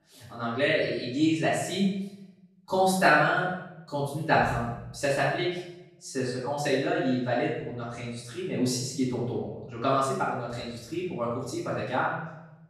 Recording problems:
off-mic speech; far
room echo; noticeable; dies away in 0.8 s

